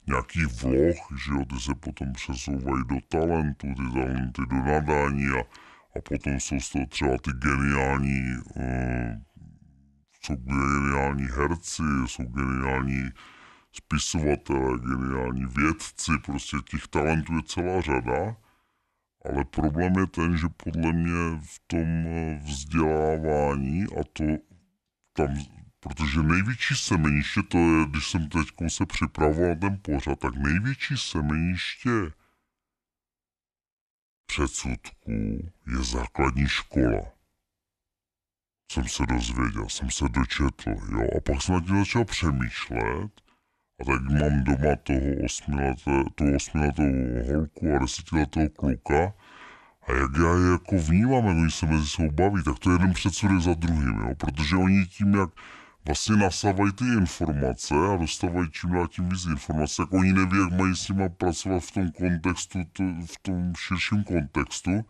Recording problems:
wrong speed and pitch; too slow and too low; 0.7 times normal speed

